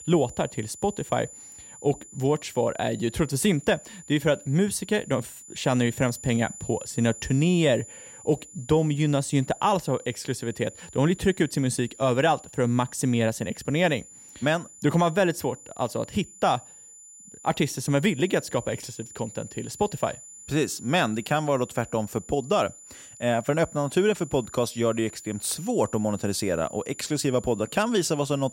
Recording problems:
high-pitched whine; noticeable; throughout; 7 kHz, 15 dB below the speech

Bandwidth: 16 kHz